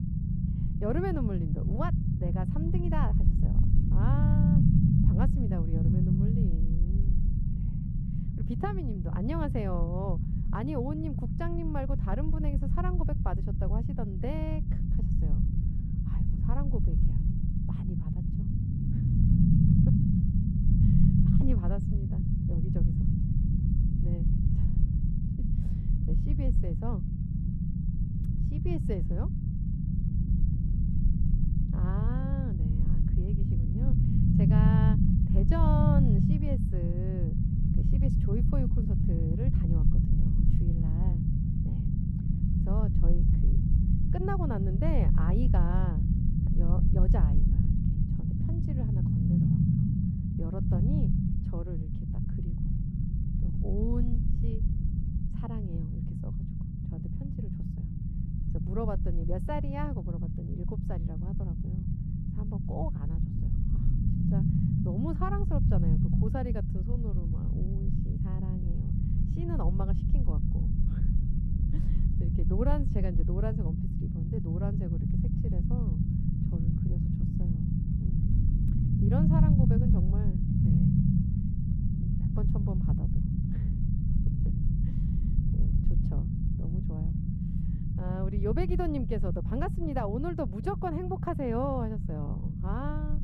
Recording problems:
muffled; very; fading above 1.5 kHz
low rumble; loud; throughout; as loud as the speech

